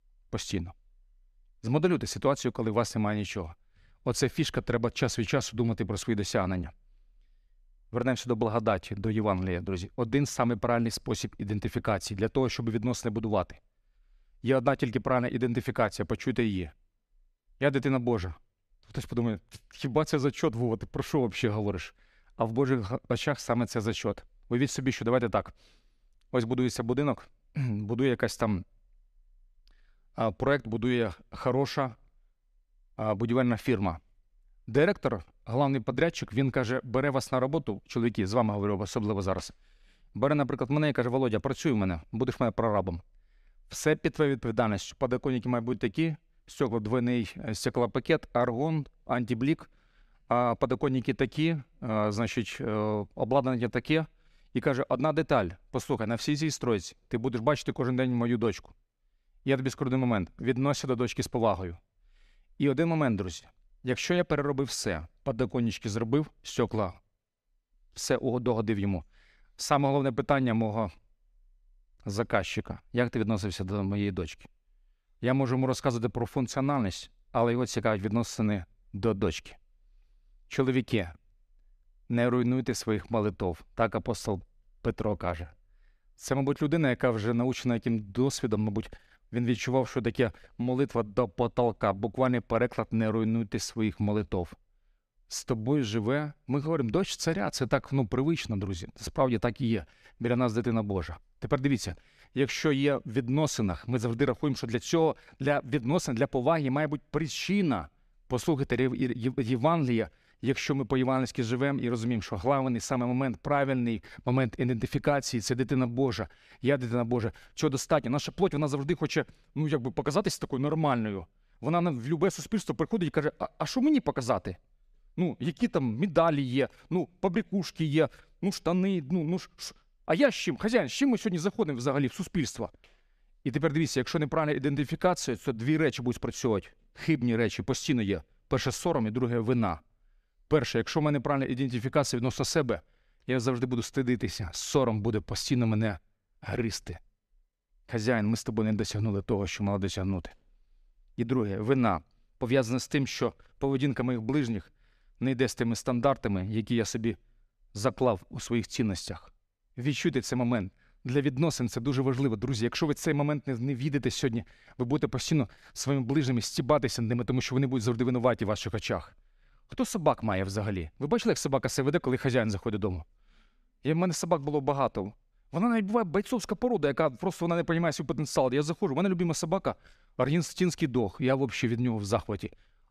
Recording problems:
none

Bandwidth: 14.5 kHz